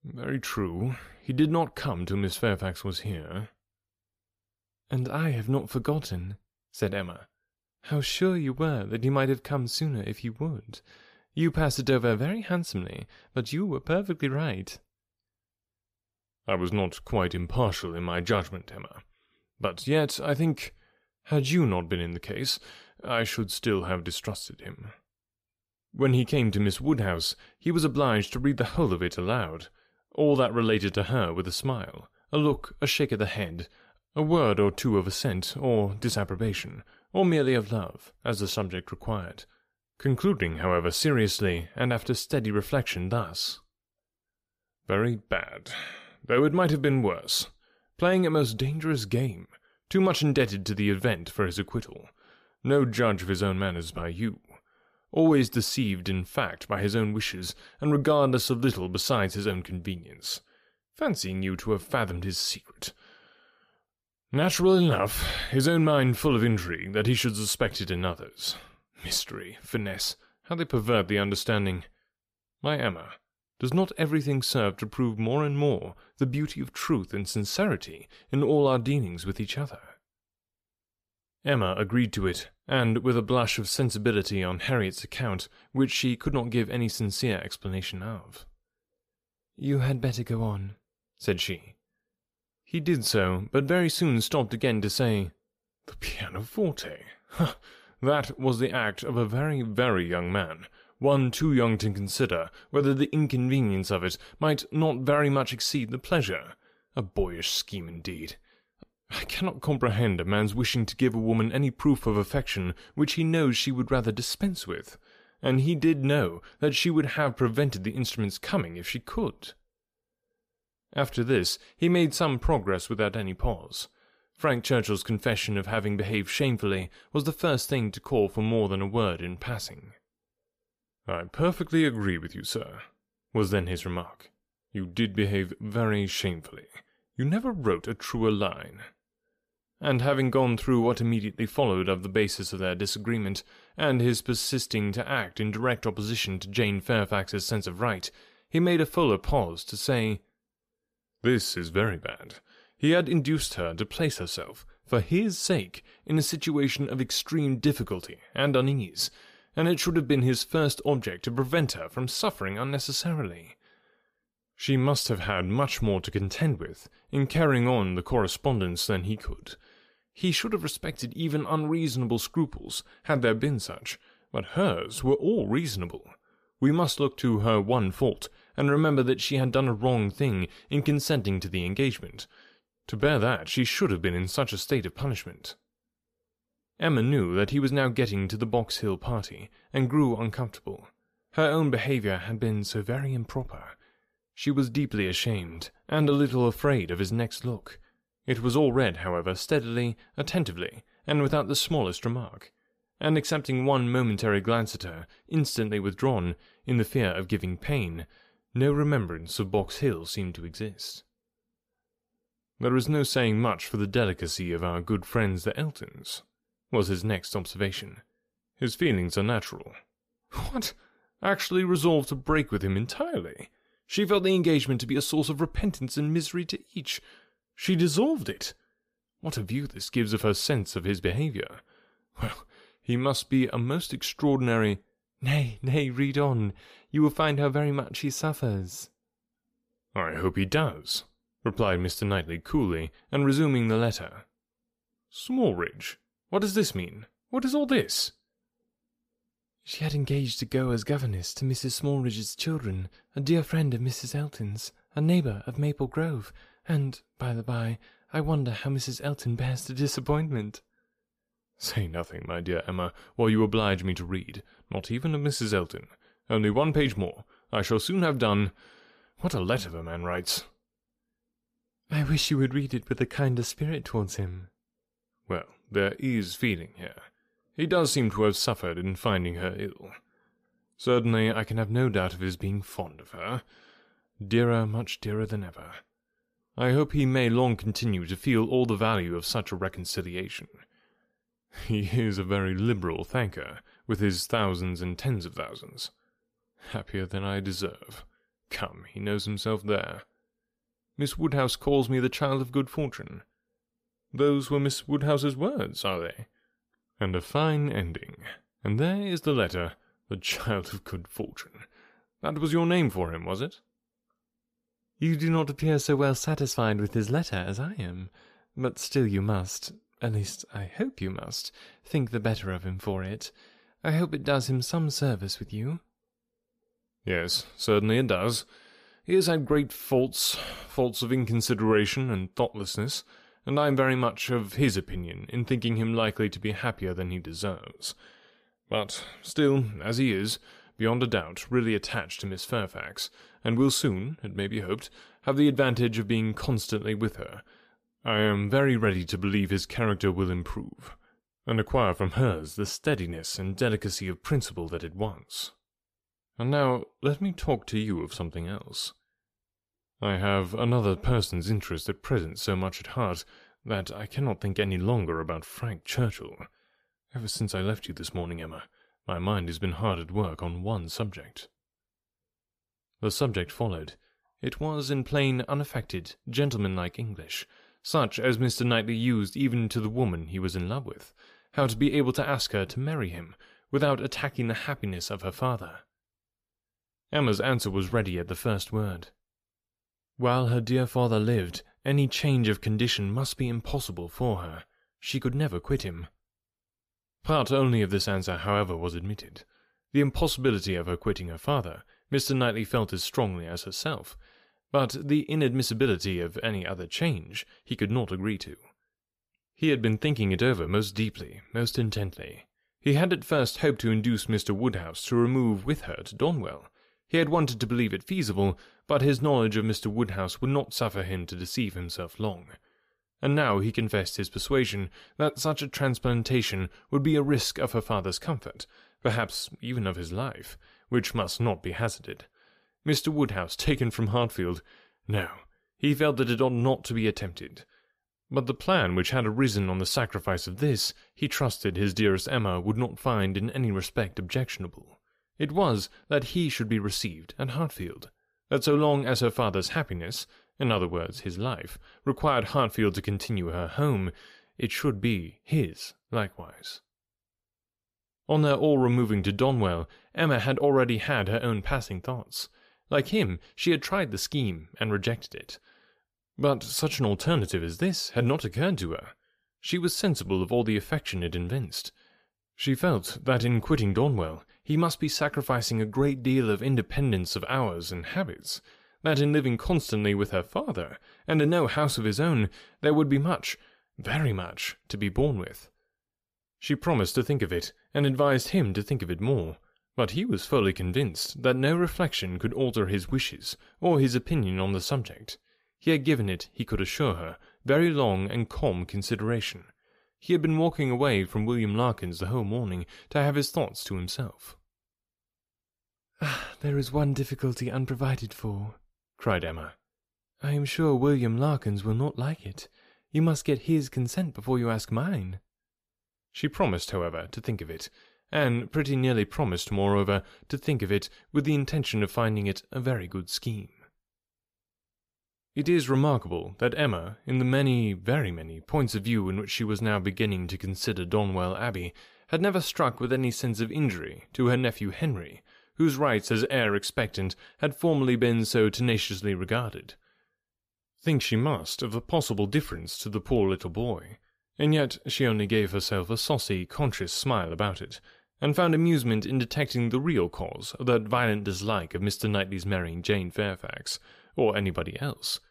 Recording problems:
none

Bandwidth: 14.5 kHz